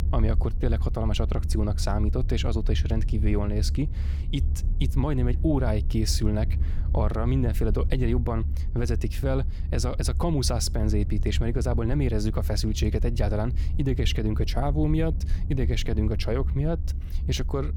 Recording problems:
low rumble; noticeable; throughout; 15 dB below the speech

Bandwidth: 18 kHz